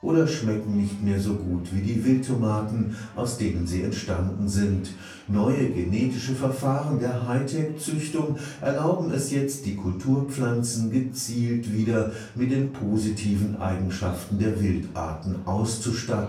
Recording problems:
off-mic speech; far
room echo; slight; dies away in 0.4 s
chatter from many people; faint; throughout; 25 dB below the speech

